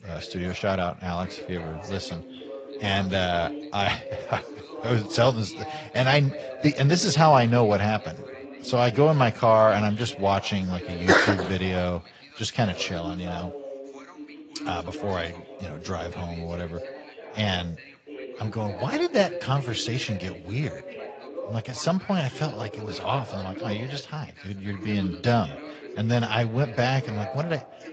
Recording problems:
garbled, watery; slightly; nothing above 7.5 kHz
background chatter; noticeable; throughout; 2 voices, 15 dB below the speech

